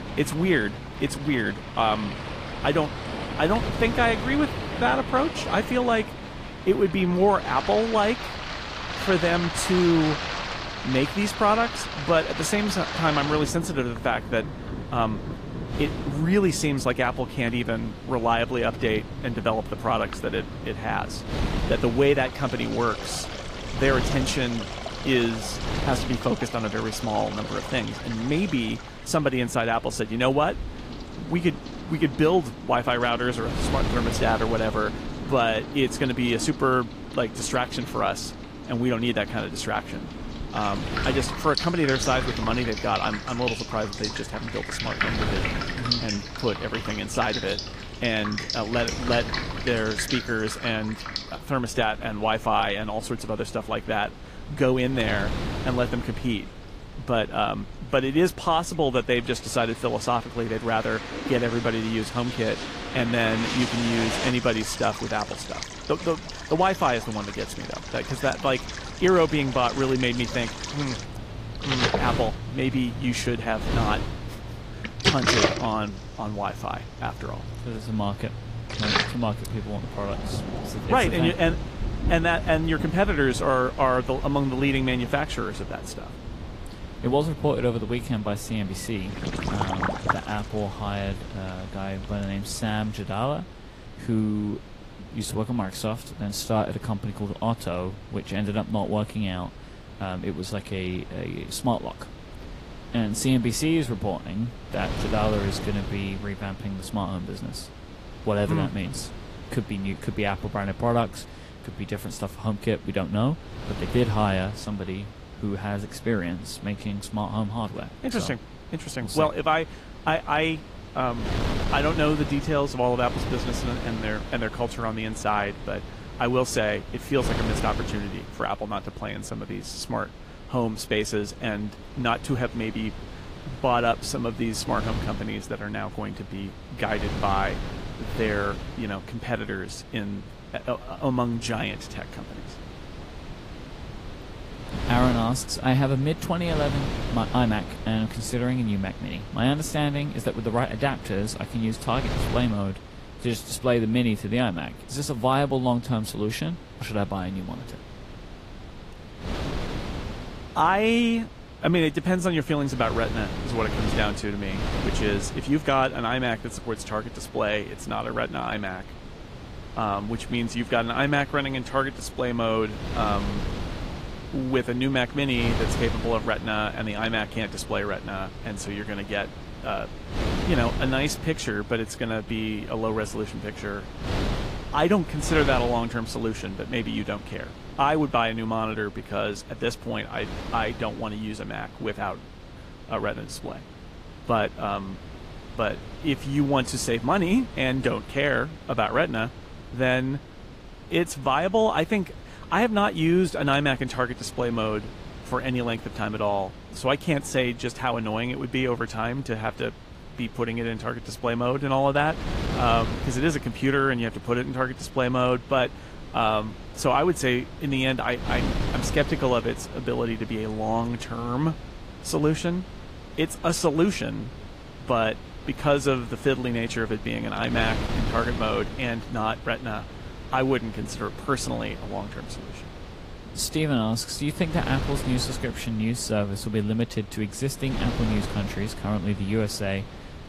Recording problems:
garbled, watery; slightly; nothing above 15 kHz
rain or running water; loud; until 1:33; 7 dB below the speech
wind noise on the microphone; occasional gusts; 15 dB below the speech

